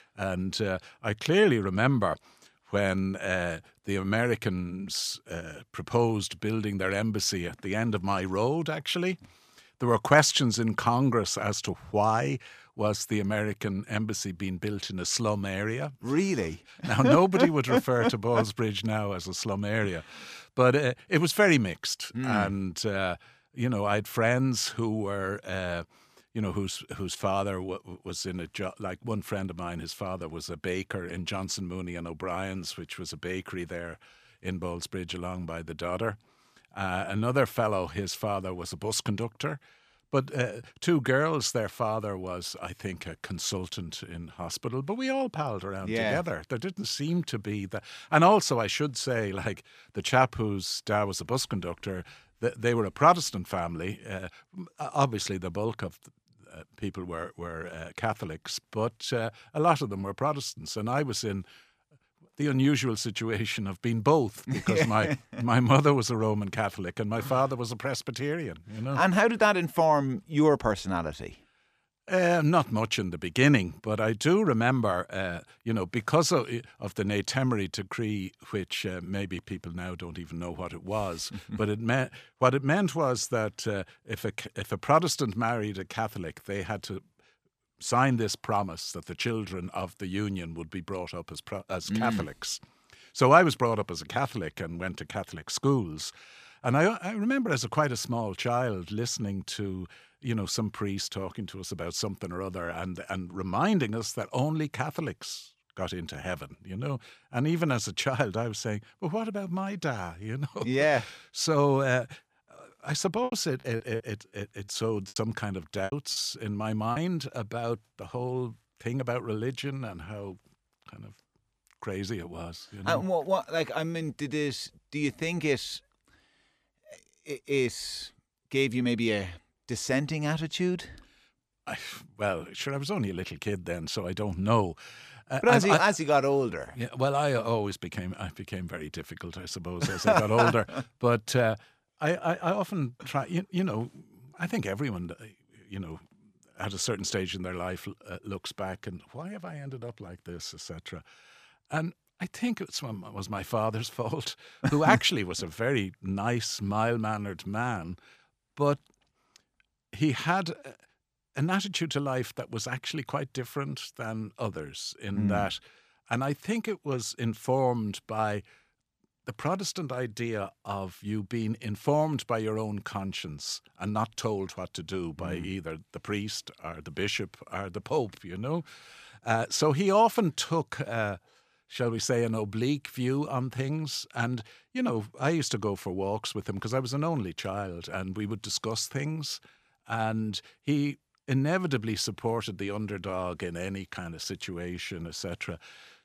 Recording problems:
choppy; very; from 1:53 to 1:57; 11% of the speech affected

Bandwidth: 14.5 kHz